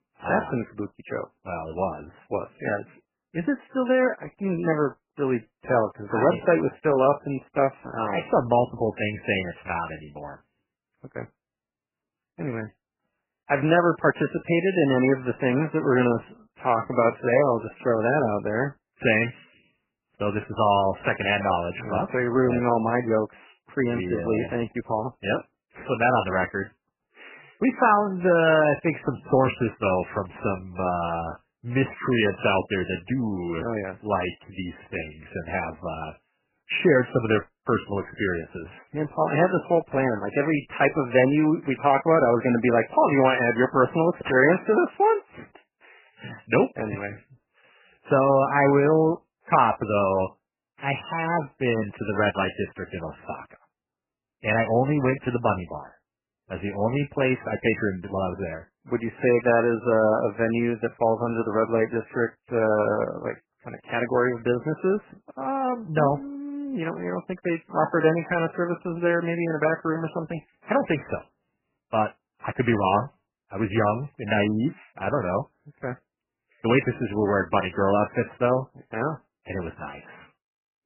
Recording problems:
garbled, watery; badly; nothing above 3 kHz
uneven, jittery; strongly; from 1 s to 1:15

